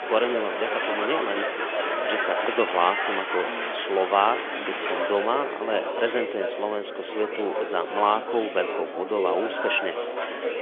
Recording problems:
phone-call audio; nothing above 3.5 kHz
murmuring crowd; loud; throughout; 1 dB below the speech

